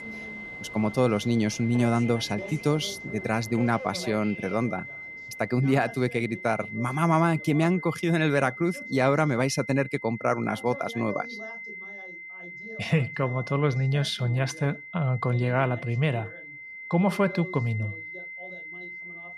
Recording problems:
high-pitched whine; noticeable; throughout; 2 kHz, 10 dB below the speech
train or aircraft noise; noticeable; throughout; 20 dB below the speech
voice in the background; noticeable; throughout; 20 dB below the speech

